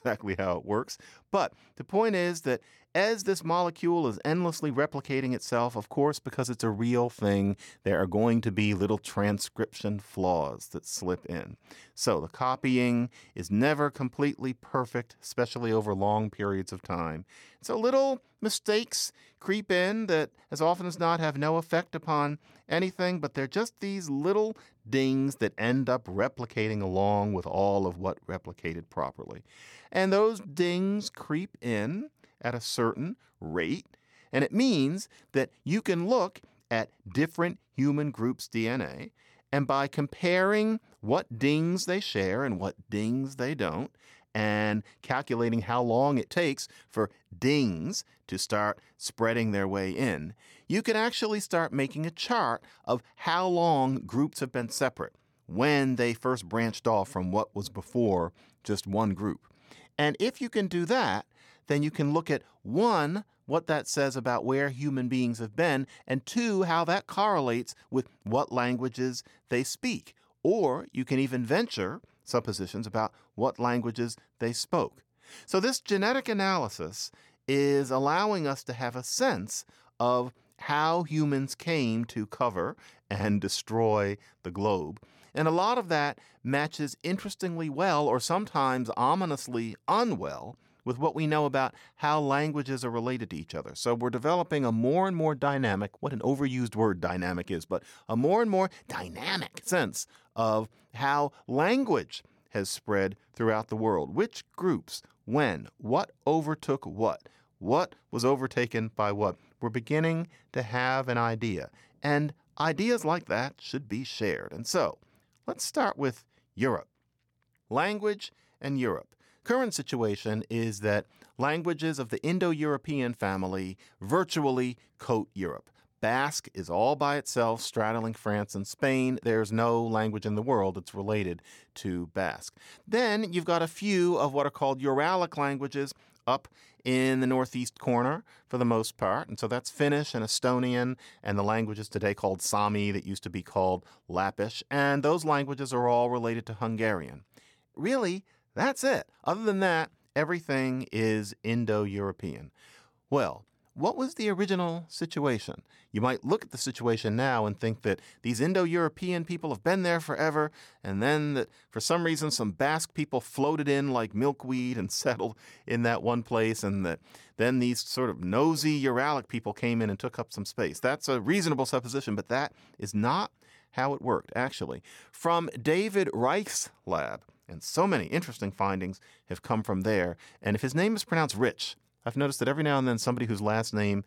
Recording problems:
none

